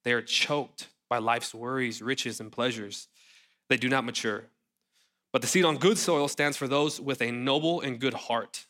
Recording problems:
none

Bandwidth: 16 kHz